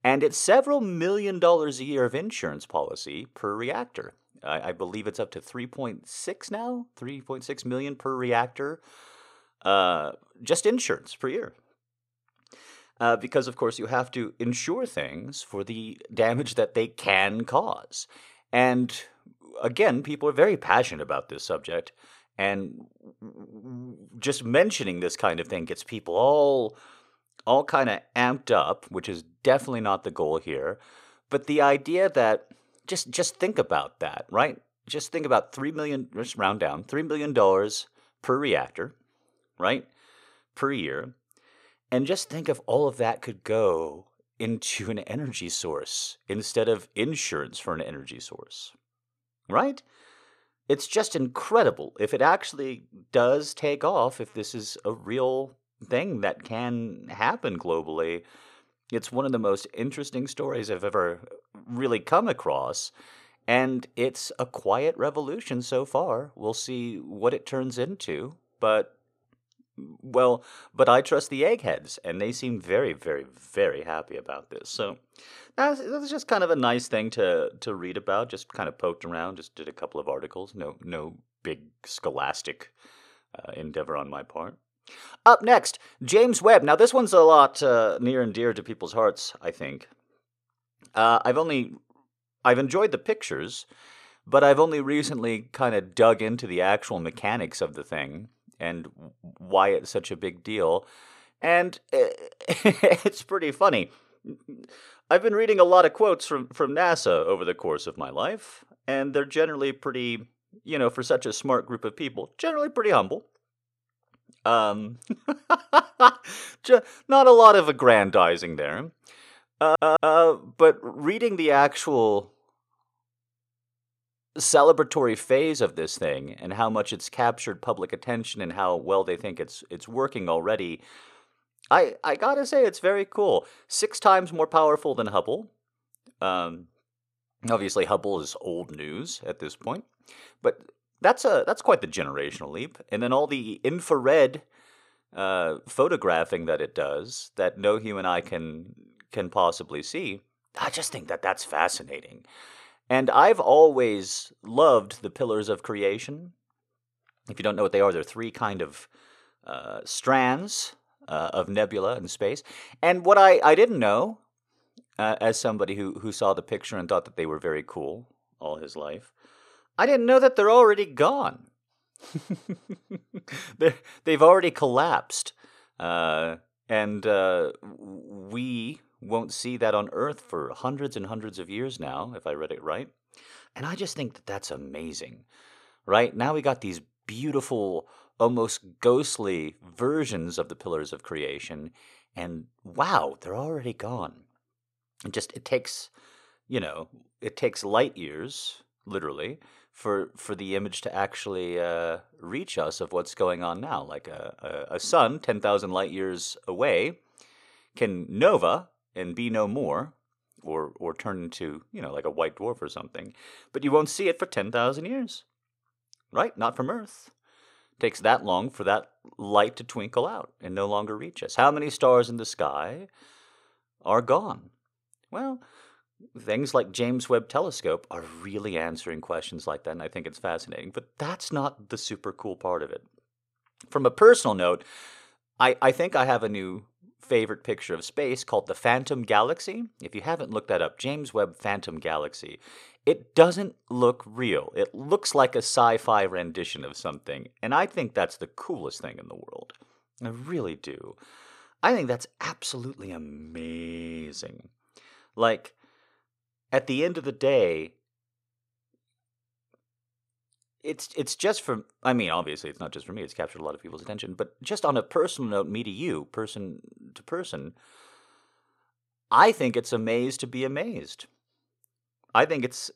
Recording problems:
audio stuttering; at 2:00

